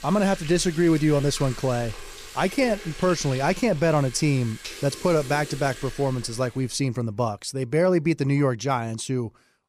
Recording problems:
household noises; noticeable; until 6 s; 15 dB below the speech

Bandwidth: 15 kHz